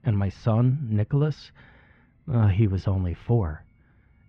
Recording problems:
muffled; very; fading above 3 kHz

